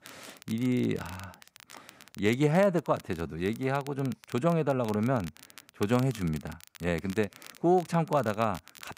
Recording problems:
crackle, like an old record; faint; 20 dB below the speech

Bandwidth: 15.5 kHz